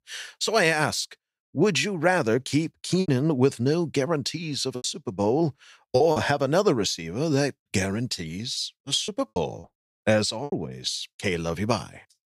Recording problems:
choppy; very; from 3 to 6 s and from 9 to 11 s; 10% of the speech affected

